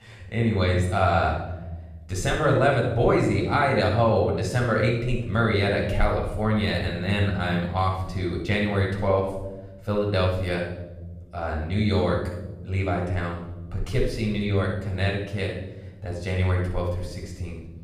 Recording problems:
off-mic speech; far
room echo; noticeable; dies away in 1.1 s

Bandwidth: 14.5 kHz